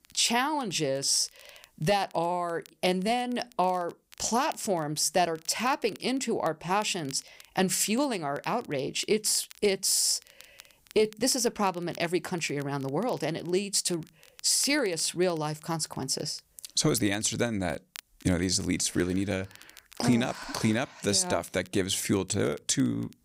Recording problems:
crackle, like an old record; faint; 25 dB below the speech

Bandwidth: 15.5 kHz